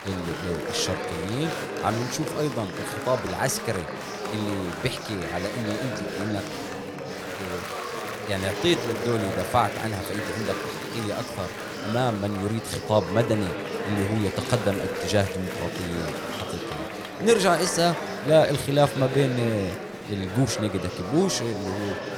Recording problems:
chatter from many people; loud; throughout; 5 dB below the speech

